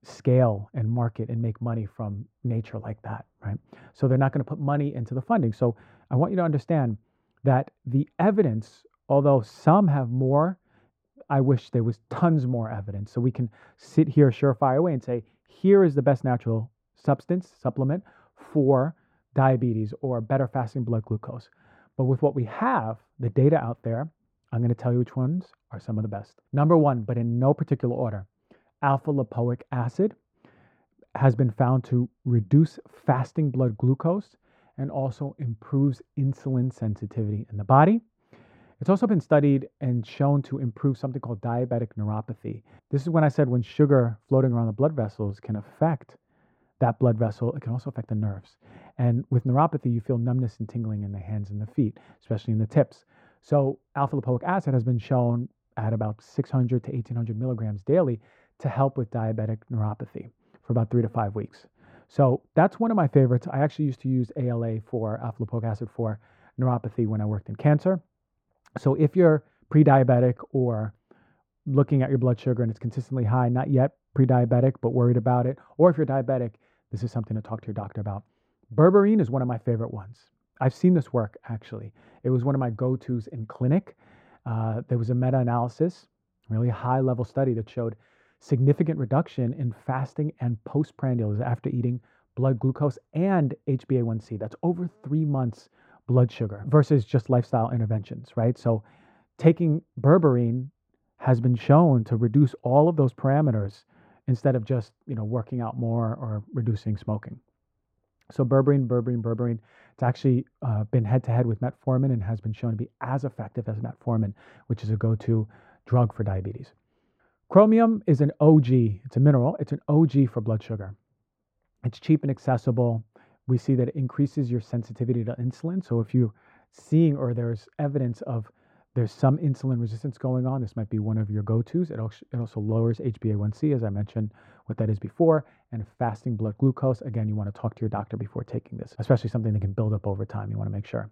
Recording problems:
muffled; very; fading above 2 kHz

